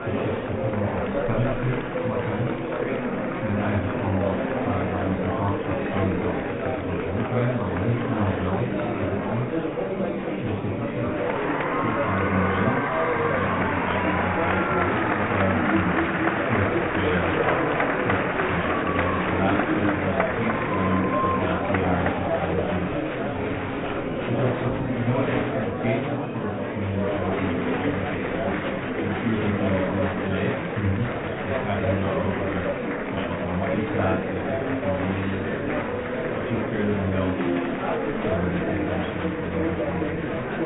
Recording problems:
high frequencies cut off; severe; nothing above 4 kHz
room echo; slight; dies away in 0.3 s
off-mic speech; somewhat distant
muffled; very slightly; fading above 2.5 kHz
murmuring crowd; very loud; throughout; 4 dB above the speech

